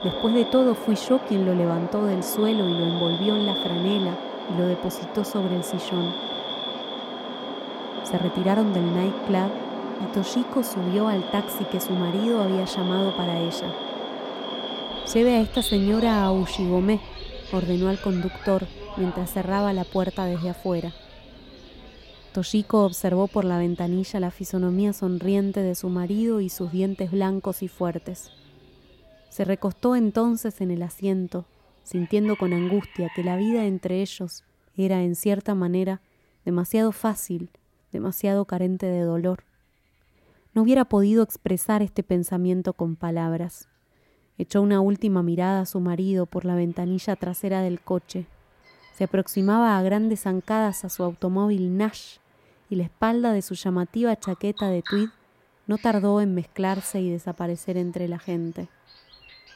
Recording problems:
animal sounds; loud; throughout; 8 dB below the speech

